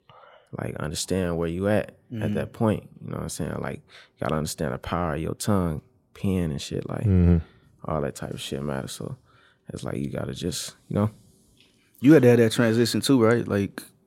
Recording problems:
none

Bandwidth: 16 kHz